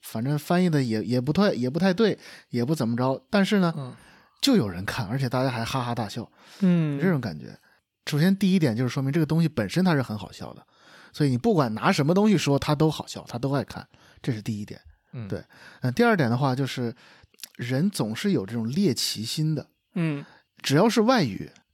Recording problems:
none

